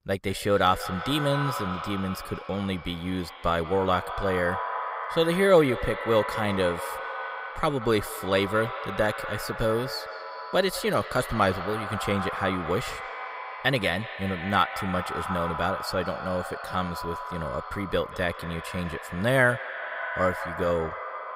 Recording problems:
echo of what is said; strong; throughout; 180 ms later, 7 dB below the speech

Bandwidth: 15.5 kHz